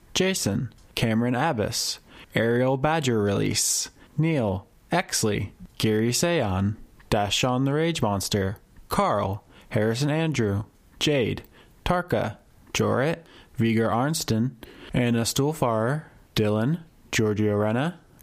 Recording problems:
squashed, flat; heavily

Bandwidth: 15 kHz